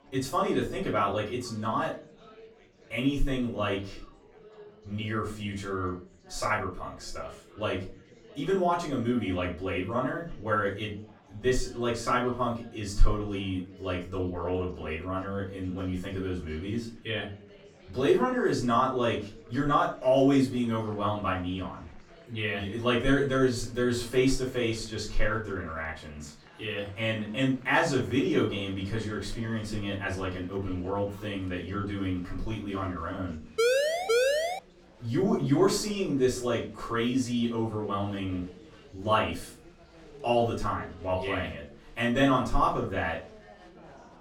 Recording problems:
off-mic speech; far
room echo; slight; dies away in 0.3 s
chatter from many people; faint; throughout; 25 dB below the speech
siren; loud; from 34 to 35 s; peak 5 dB above the speech

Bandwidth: 17.5 kHz